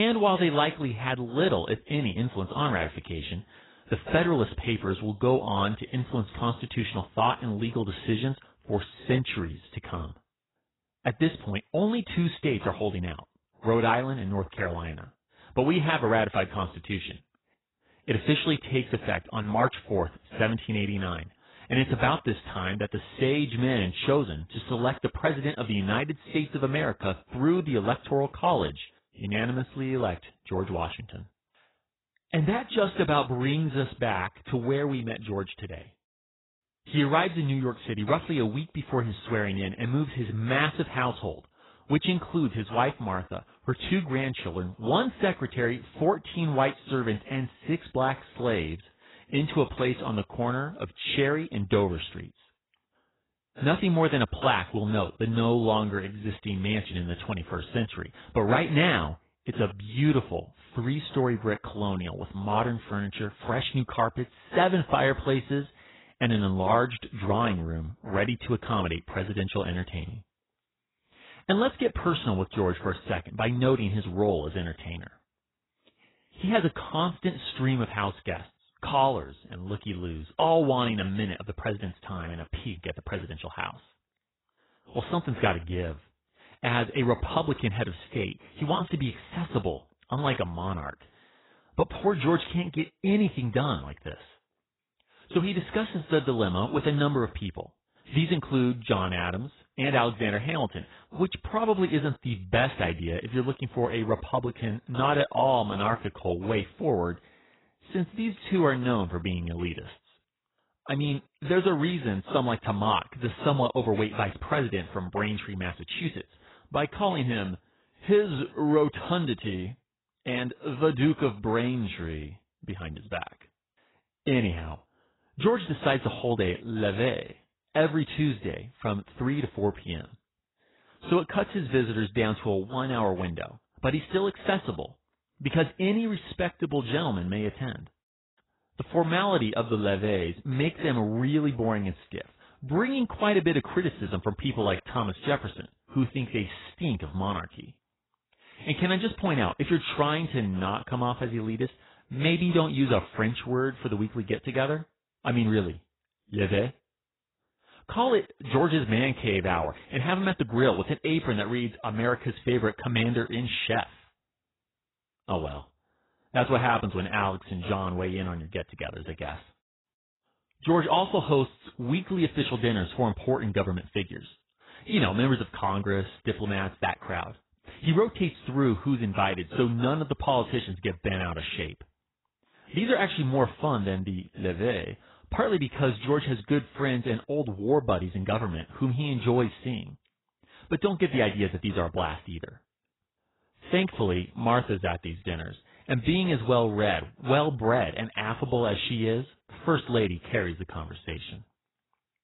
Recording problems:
garbled, watery; badly; nothing above 4 kHz
abrupt cut into speech; at the start

